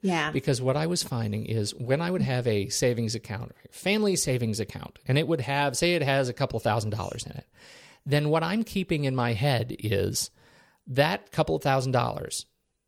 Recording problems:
none

